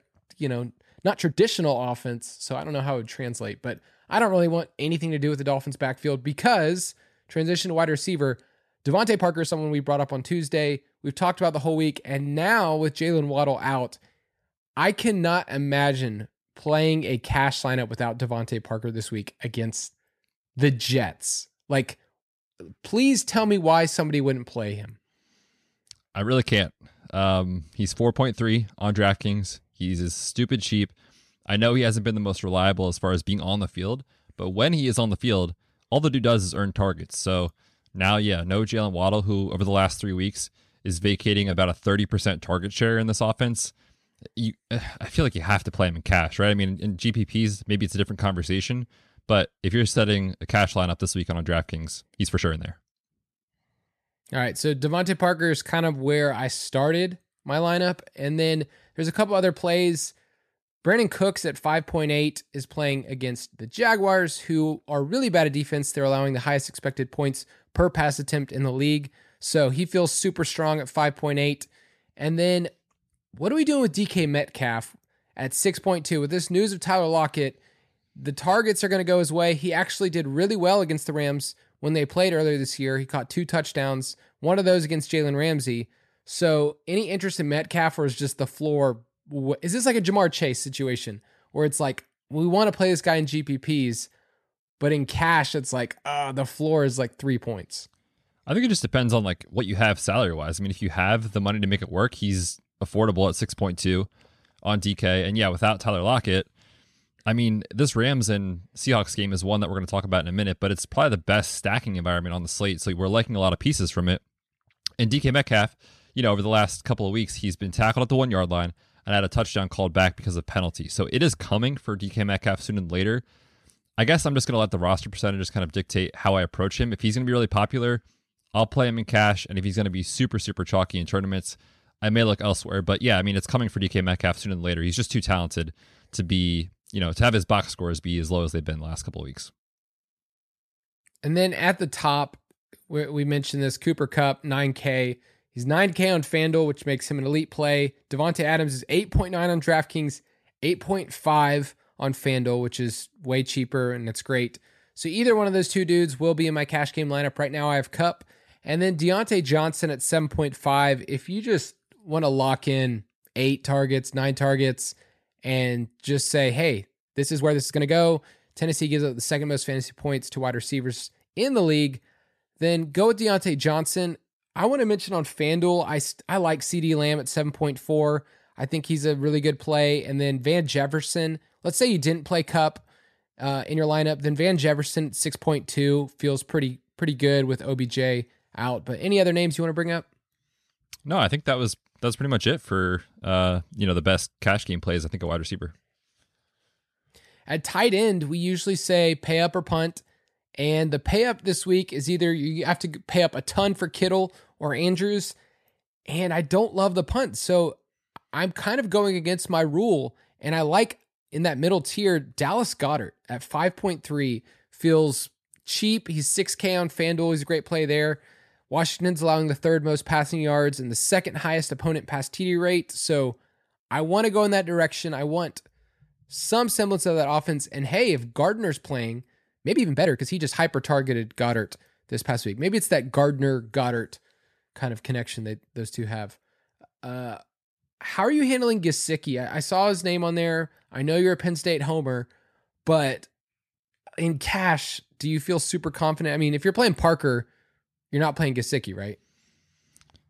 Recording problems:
uneven, jittery; strongly; from 1 s to 3:51

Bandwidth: 13.5 kHz